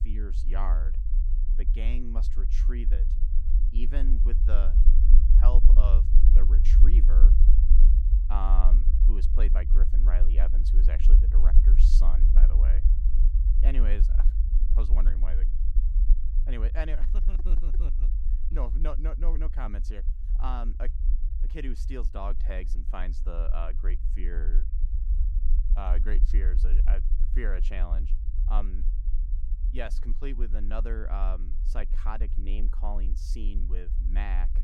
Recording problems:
low rumble; loud; throughout; 7 dB below the speech

